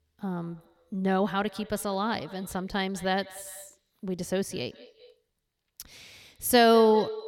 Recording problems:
echo of what is said; faint; throughout; 200 ms later, 20 dB below the speech

